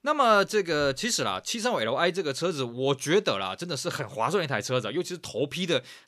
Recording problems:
none

